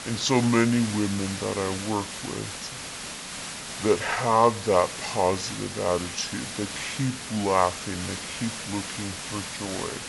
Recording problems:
wrong speed and pitch; too slow and too low; 0.7 times normal speed
high frequencies cut off; slight; nothing above 8 kHz
hiss; loud; throughout; 7 dB below the speech

